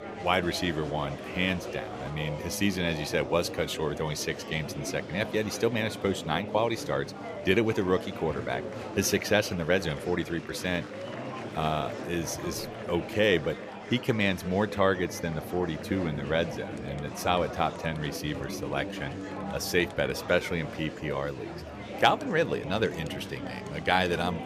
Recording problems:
murmuring crowd; loud; throughout; 9 dB below the speech

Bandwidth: 14.5 kHz